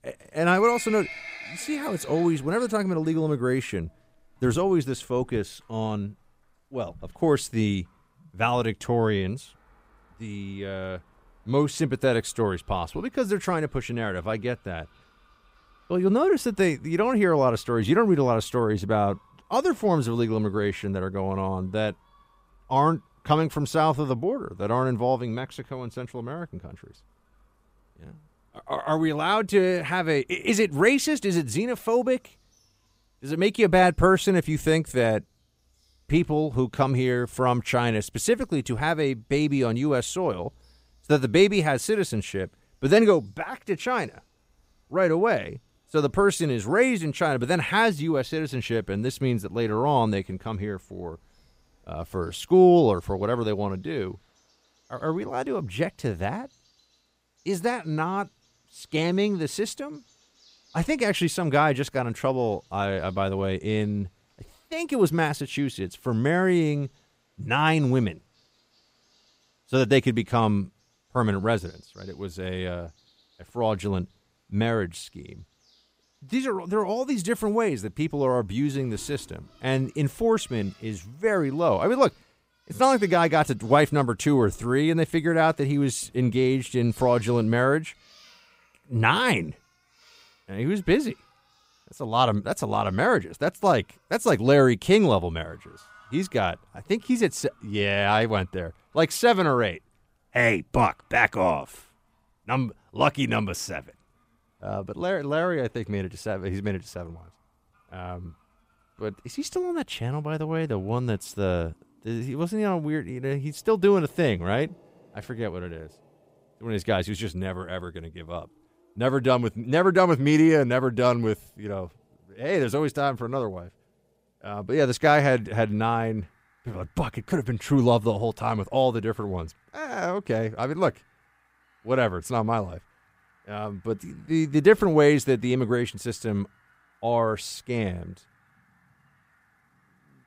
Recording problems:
animal sounds; faint; throughout; 25 dB below the speech

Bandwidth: 15.5 kHz